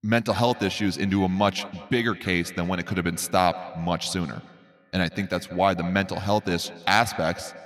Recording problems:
echo of what is said; noticeable; throughout; 170 ms later, 15 dB below the speech

